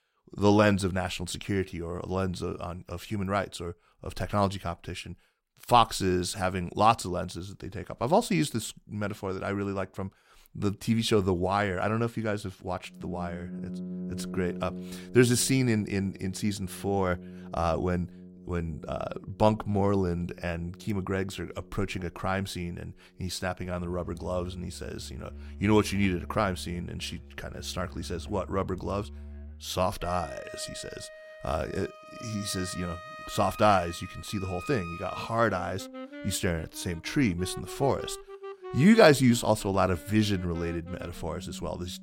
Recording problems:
background music; noticeable; from 13 s on; 15 dB below the speech

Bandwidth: 16 kHz